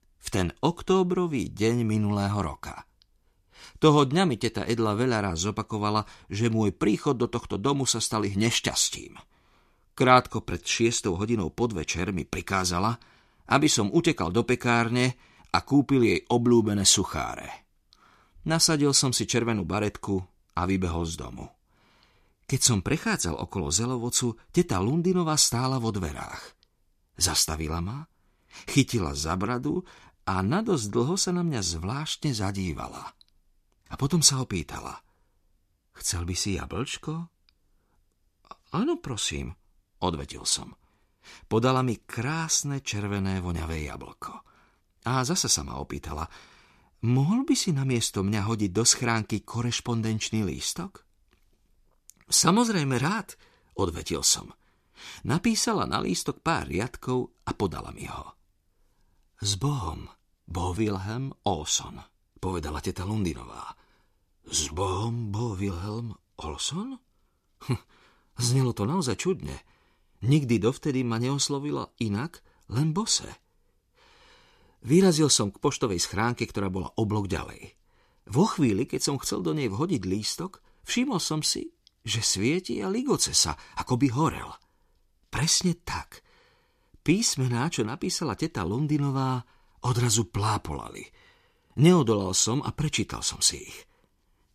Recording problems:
none

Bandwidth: 14.5 kHz